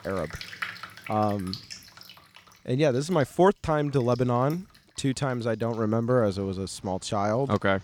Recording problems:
rain or running water; noticeable; throughout; 15 dB below the speech

